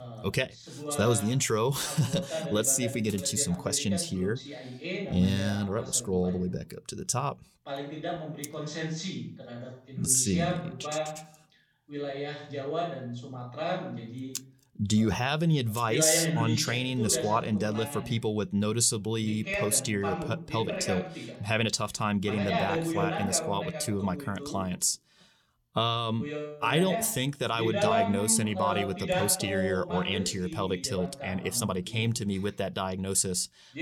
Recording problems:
voice in the background; loud; throughout; 6 dB below the speech

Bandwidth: 18.5 kHz